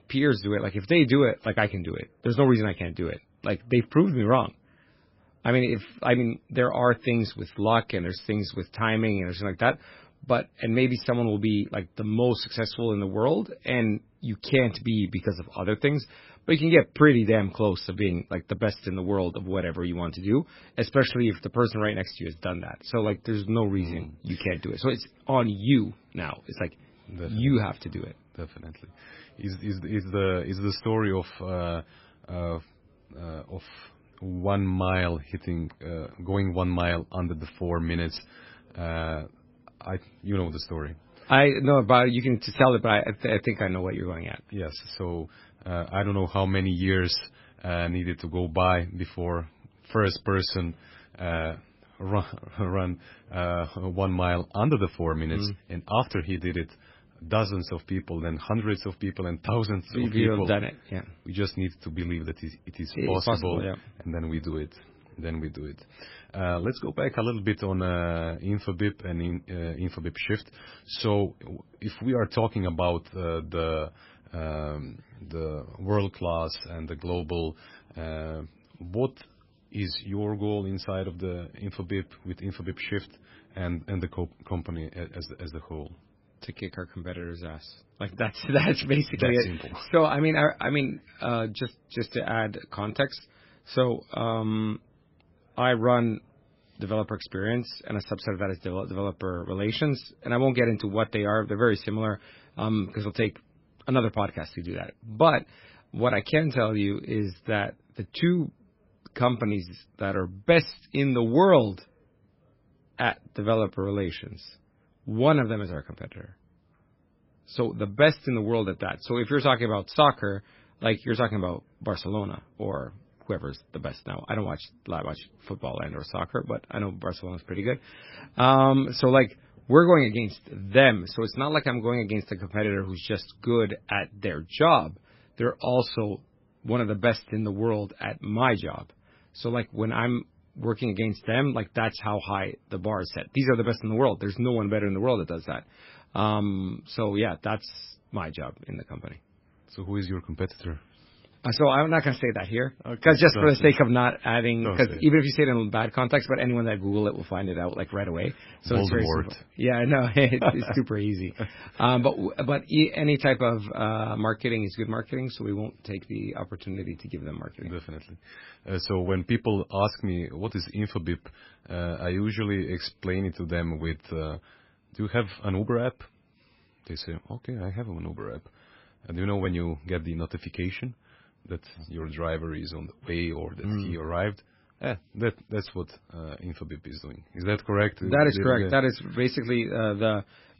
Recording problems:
garbled, watery; badly; nothing above 5.5 kHz

